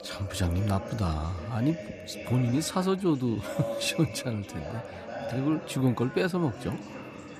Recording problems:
background chatter; noticeable; throughout; 4 voices, 10 dB below the speech

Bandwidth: 14.5 kHz